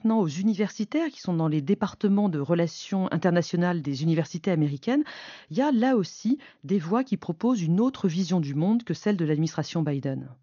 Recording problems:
high frequencies cut off; noticeable; nothing above 6.5 kHz

